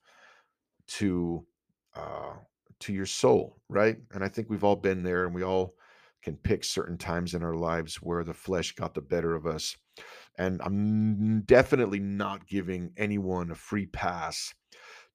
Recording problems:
none

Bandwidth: 15 kHz